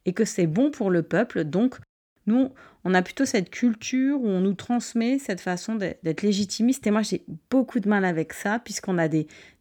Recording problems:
none

